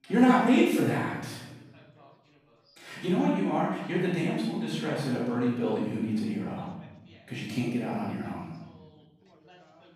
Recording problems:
room echo; strong; dies away in 1.1 s
off-mic speech; far
background chatter; faint; throughout; 3 voices, 30 dB below the speech

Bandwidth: 15.5 kHz